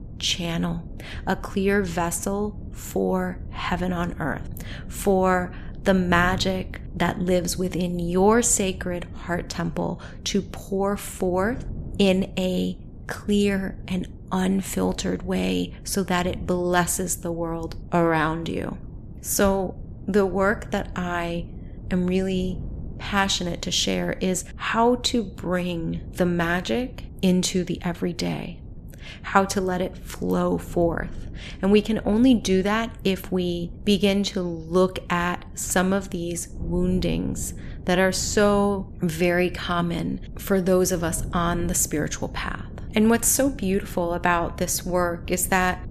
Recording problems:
wind noise on the microphone; occasional gusts; 25 dB below the speech

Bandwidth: 14.5 kHz